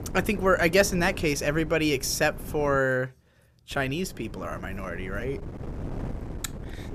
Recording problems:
wind noise on the microphone; occasional gusts; until 3 s and from 3.5 s on; 20 dB below the speech

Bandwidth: 14.5 kHz